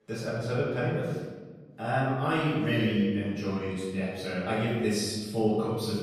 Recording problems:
room echo; strong; dies away in 1.3 s
off-mic speech; far

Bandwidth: 14.5 kHz